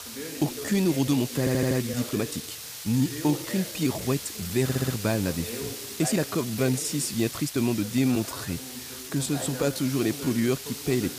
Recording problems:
hiss; loud; throughout; 9 dB below the speech
voice in the background; noticeable; throughout; 15 dB below the speech
uneven, jittery; strongly; from 0.5 to 10 s
audio stuttering; at 1.5 s and at 4.5 s

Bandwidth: 15 kHz